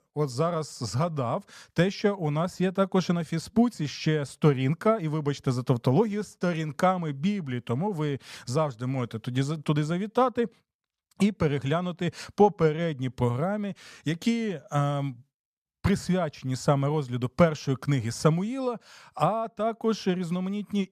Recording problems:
none

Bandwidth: 14.5 kHz